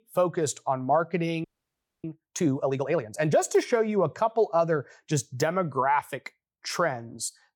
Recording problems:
audio freezing; at 1.5 s for 0.5 s

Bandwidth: 18 kHz